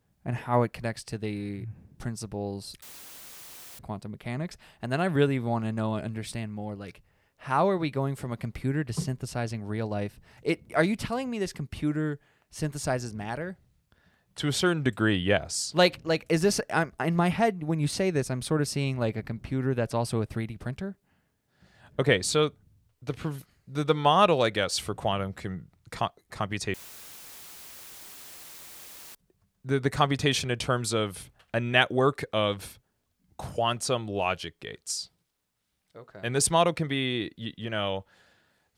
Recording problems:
audio cutting out; filled with static; at 3 s for 1 s and at 27 s for 2.5 s

